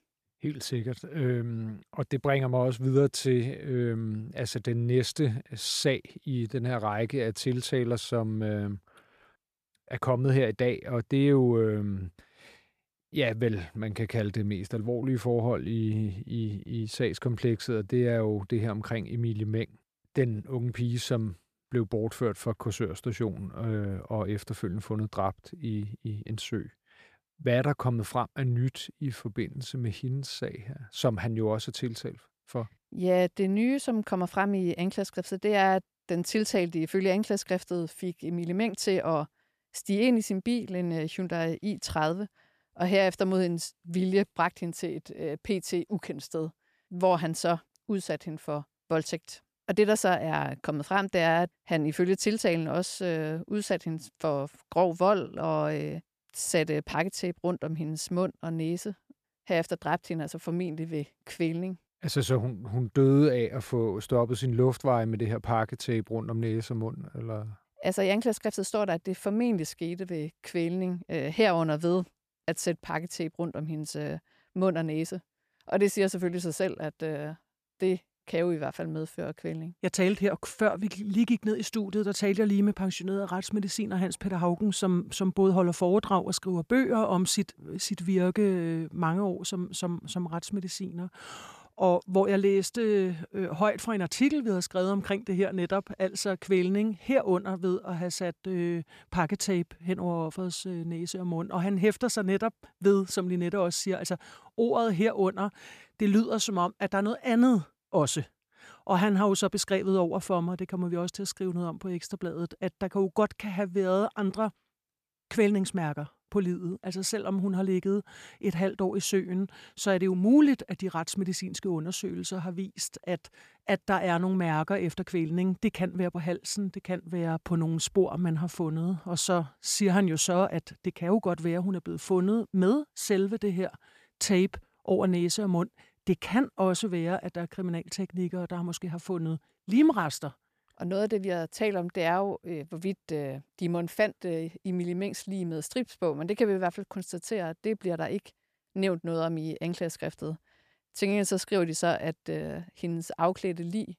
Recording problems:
none

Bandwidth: 14.5 kHz